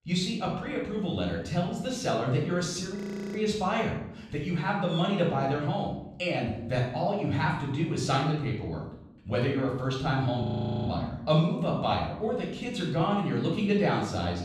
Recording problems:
off-mic speech; far
room echo; noticeable; dies away in 0.7 s
audio freezing; at 3 s and at 10 s

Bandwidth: 14 kHz